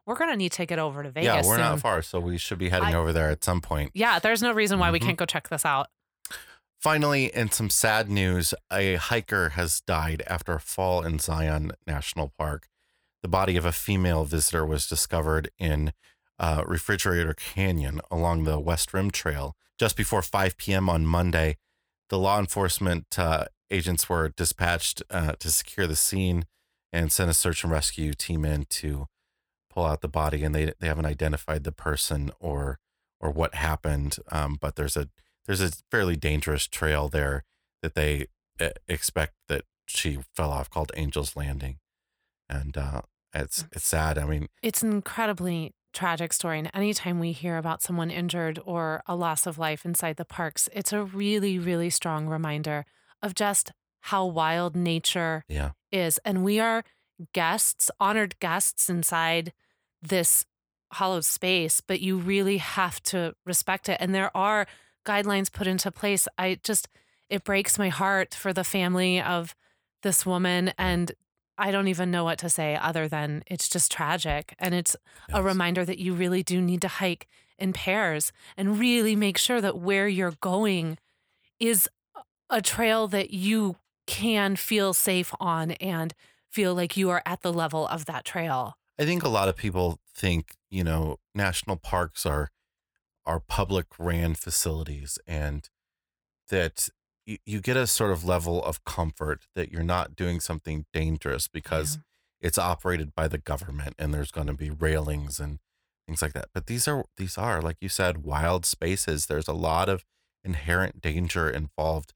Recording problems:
none

